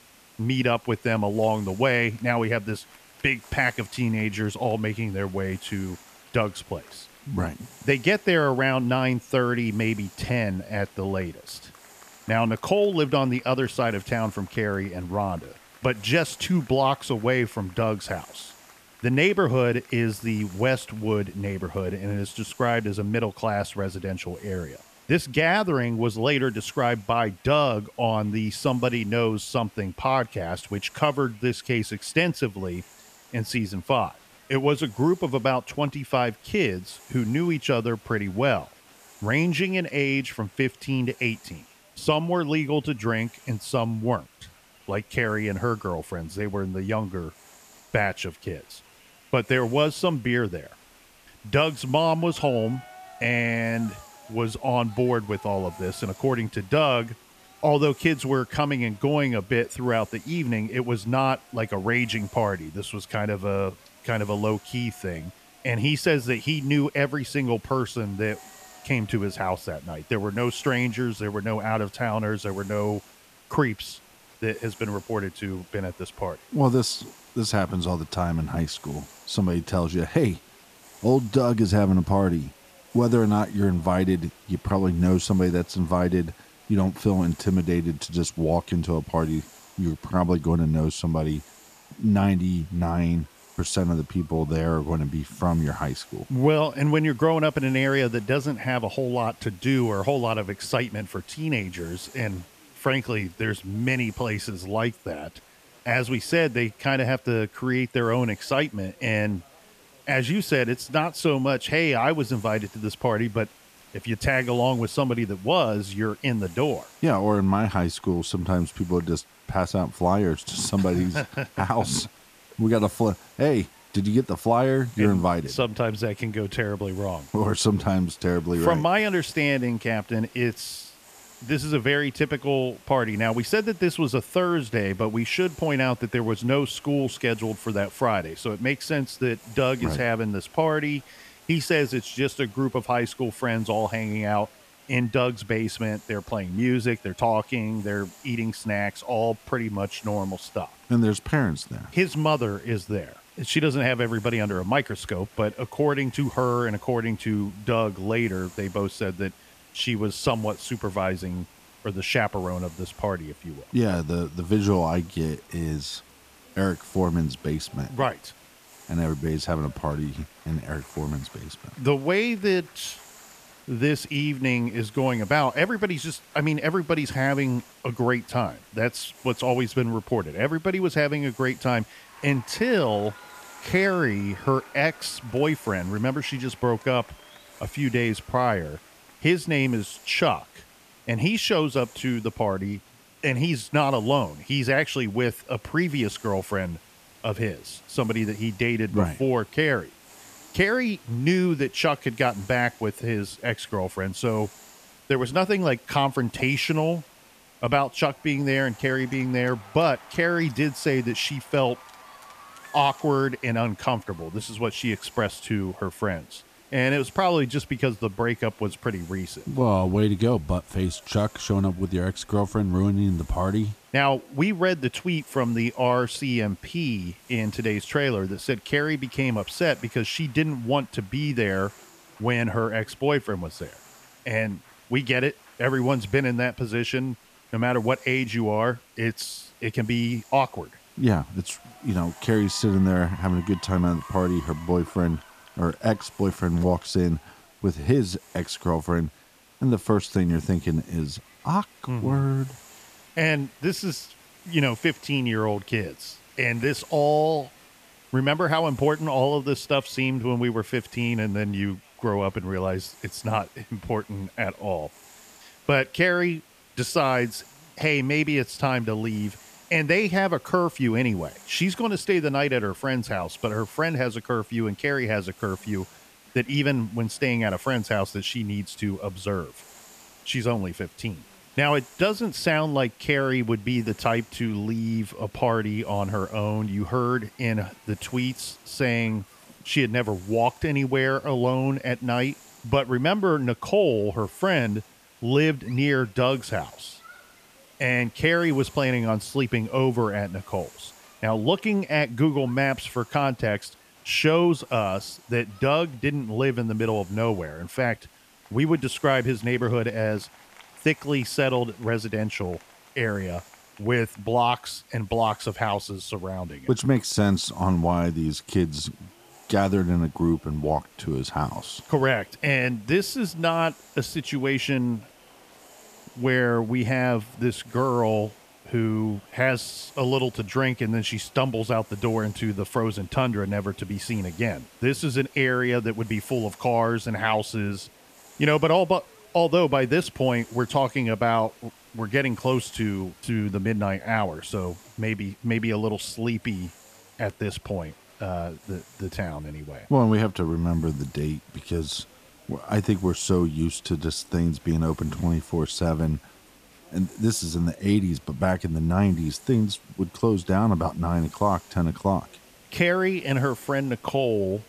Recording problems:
crowd noise; faint; throughout; 30 dB below the speech
hiss; faint; throughout; 25 dB below the speech

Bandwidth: 14.5 kHz